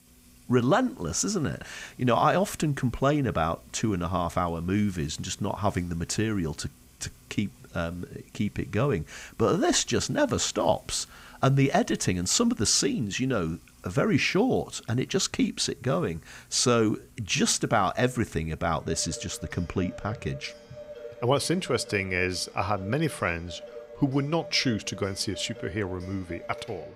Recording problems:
household noises; faint; throughout; 20 dB below the speech

